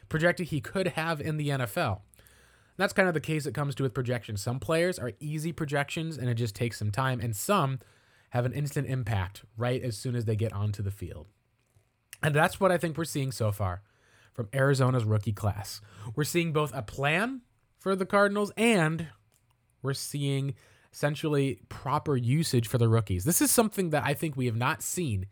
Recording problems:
none

